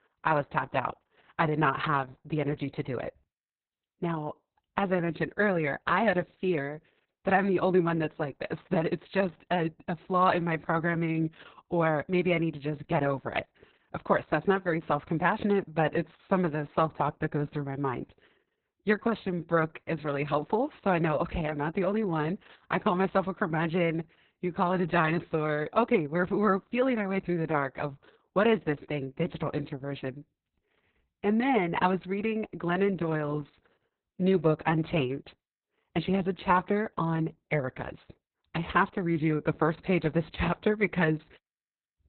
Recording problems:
garbled, watery; badly; nothing above 4 kHz

